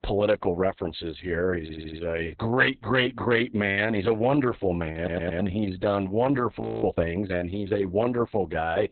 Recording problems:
garbled, watery; badly; nothing above 4 kHz
audio stuttering; at 1.5 s and at 5 s
audio freezing; at 6.5 s

